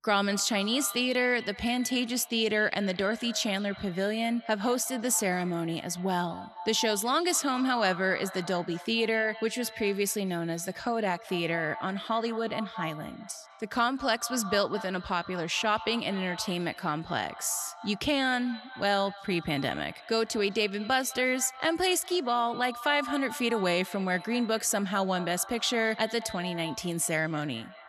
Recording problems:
echo of what is said; noticeable; throughout; 210 ms later, 15 dB below the speech

